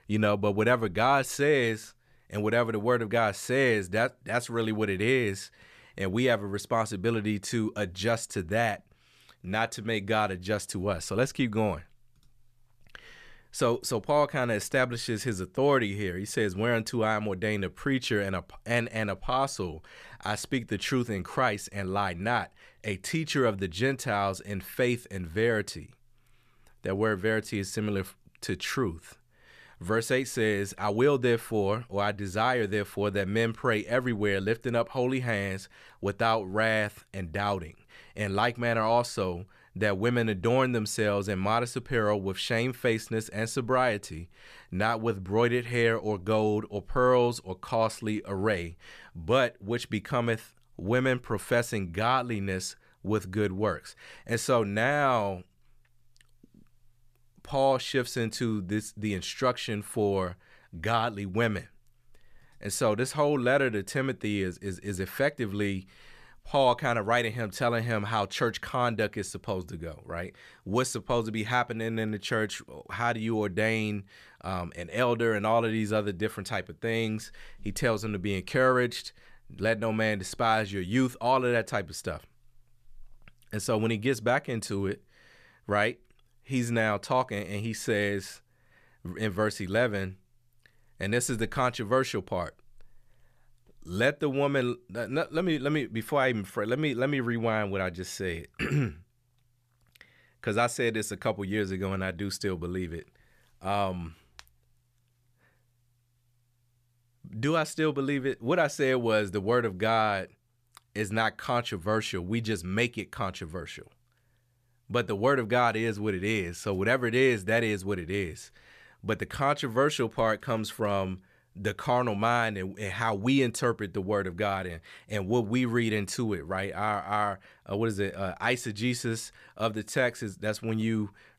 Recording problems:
none

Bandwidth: 14.5 kHz